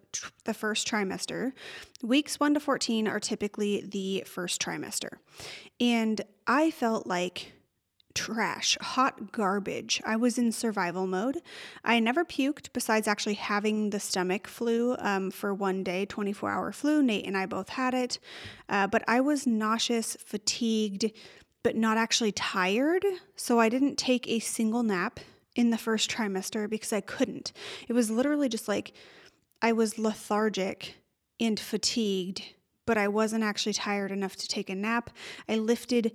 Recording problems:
none

